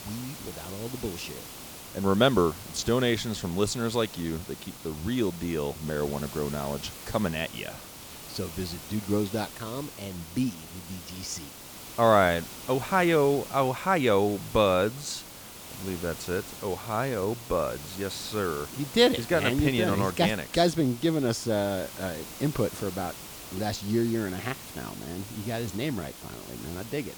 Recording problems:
hiss; noticeable; throughout; 15 dB below the speech

